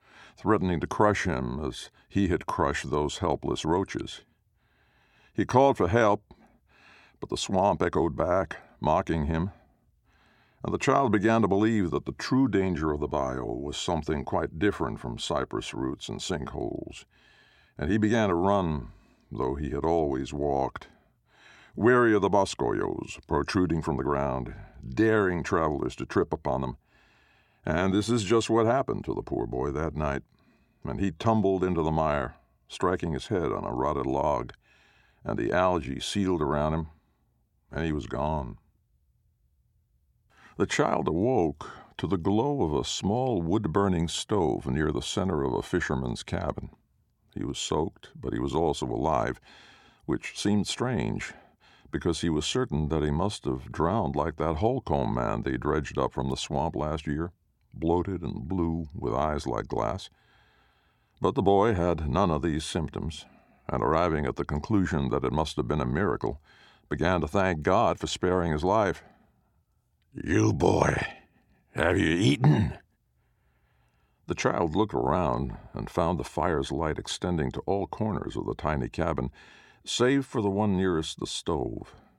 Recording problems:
none

